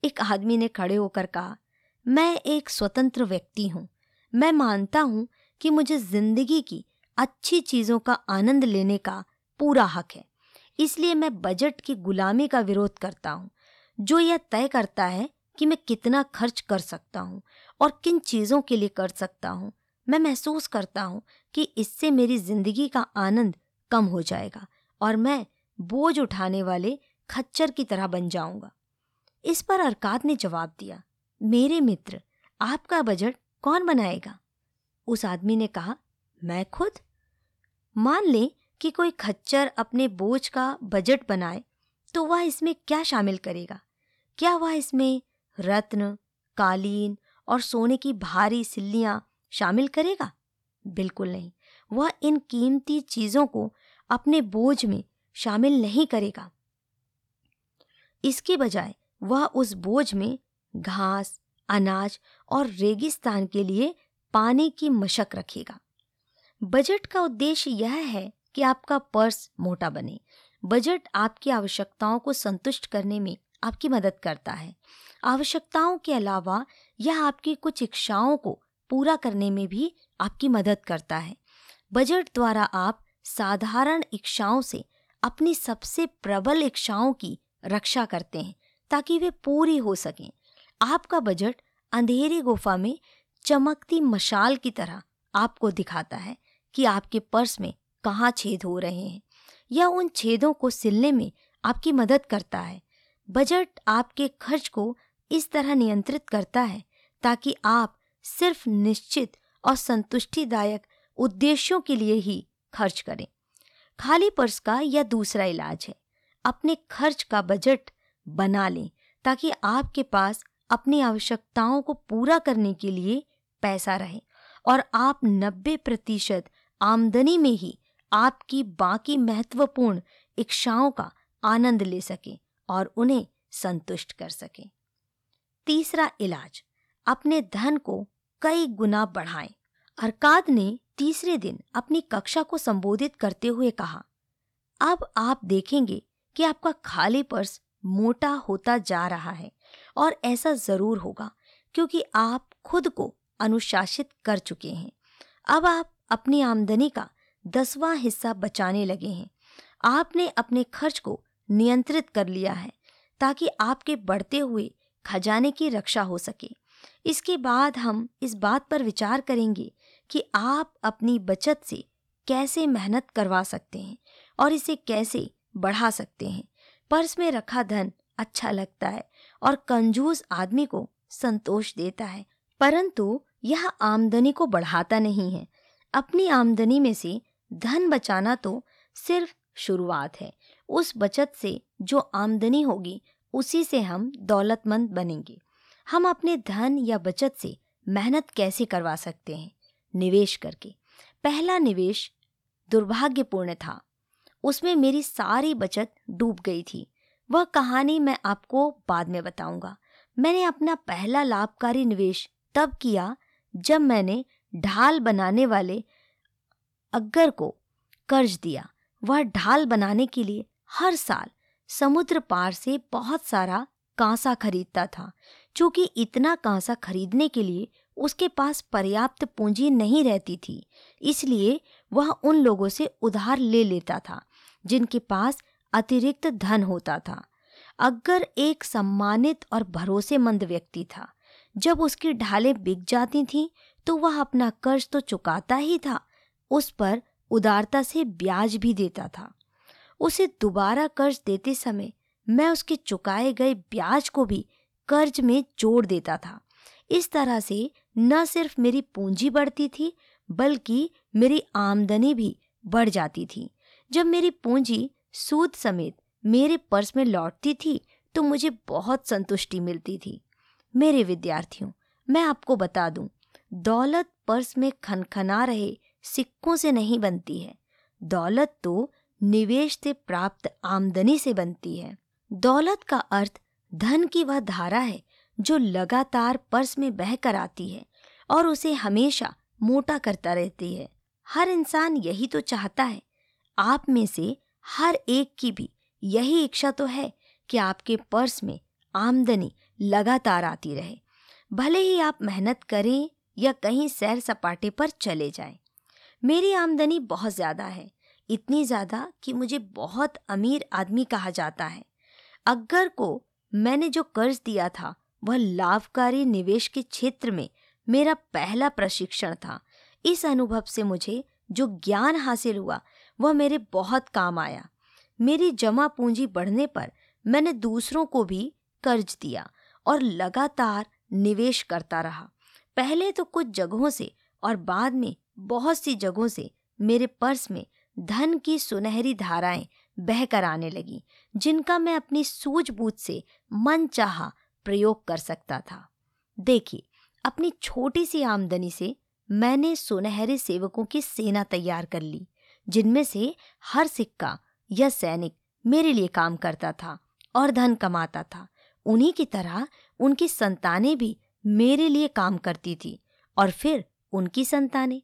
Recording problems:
none

